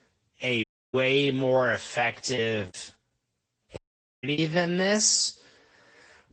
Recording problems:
wrong speed, natural pitch; too slow; 0.6 times normal speed
garbled, watery; slightly; nothing above 8 kHz
audio cutting out; at 0.5 s and at 4 s
choppy; very; from 2.5 to 4.5 s; 11% of the speech affected

